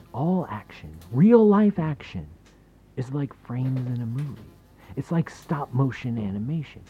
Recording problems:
muffled; very; fading above 1.5 kHz
electrical hum; faint; throughout; 50 Hz, 25 dB below the speech

